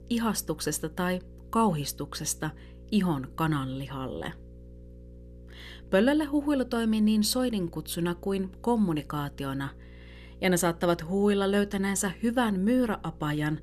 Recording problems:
electrical hum; faint; throughout; 60 Hz, 25 dB below the speech

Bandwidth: 14 kHz